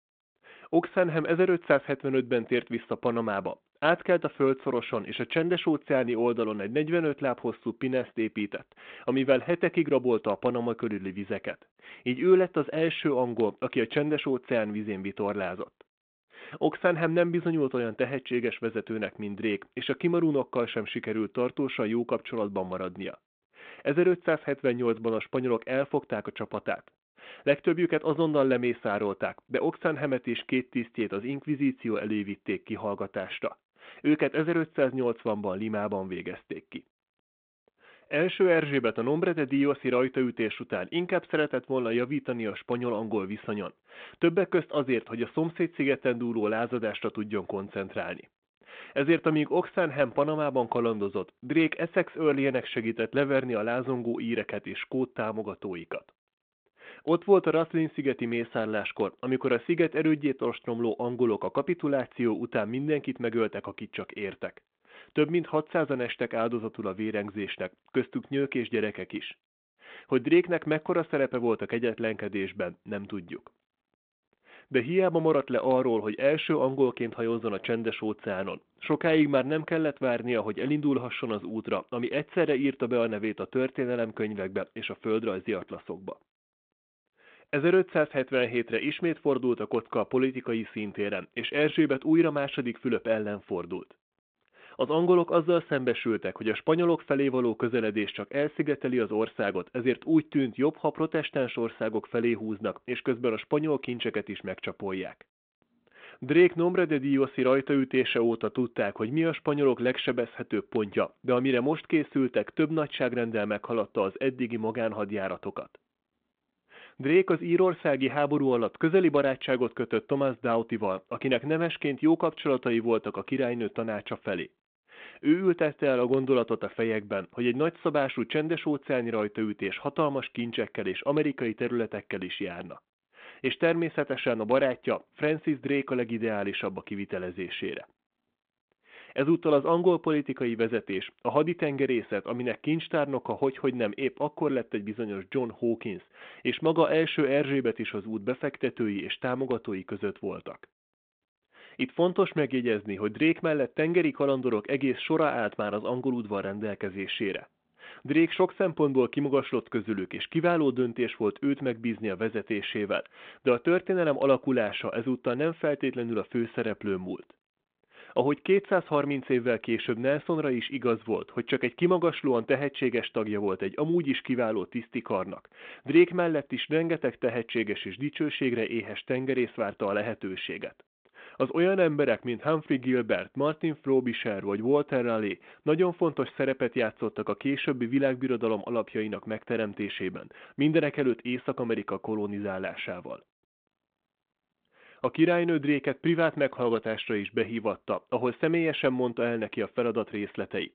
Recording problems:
phone-call audio

